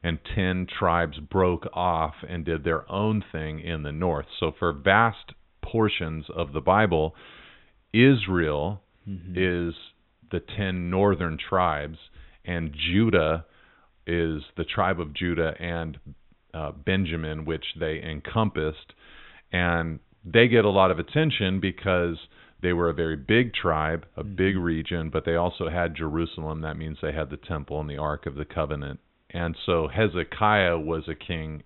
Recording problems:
high frequencies cut off; severe; nothing above 4 kHz

